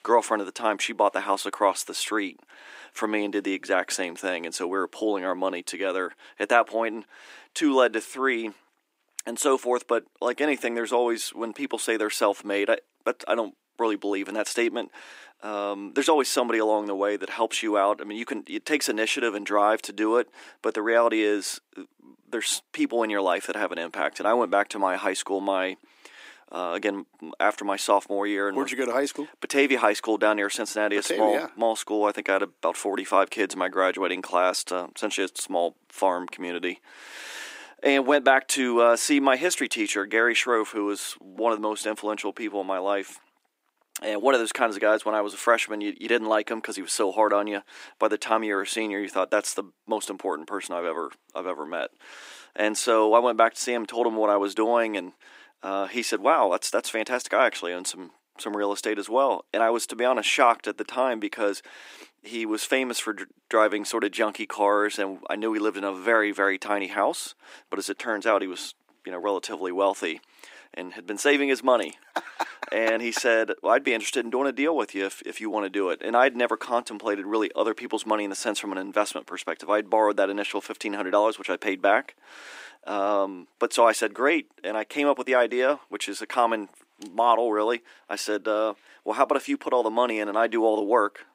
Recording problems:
thin; somewhat; fading below 300 Hz

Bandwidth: 15.5 kHz